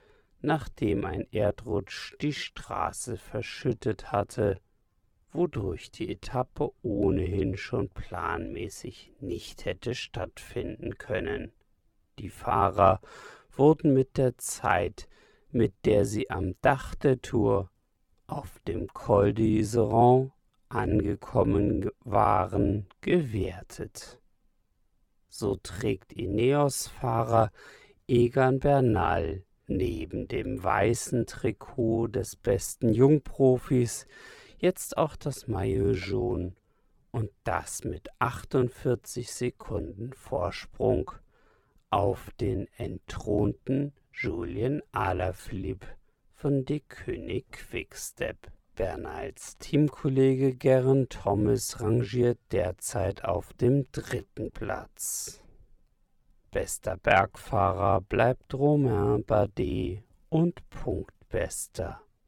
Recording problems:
wrong speed, natural pitch; too slow; 0.6 times normal speed

